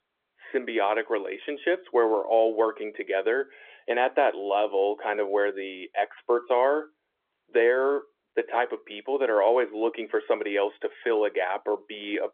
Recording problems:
phone-call audio; nothing above 3.5 kHz

